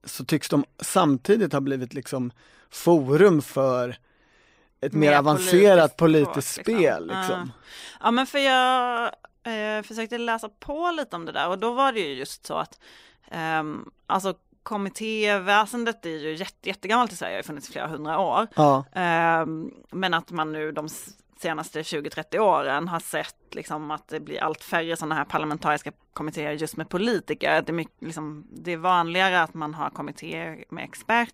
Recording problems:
none

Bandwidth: 15.5 kHz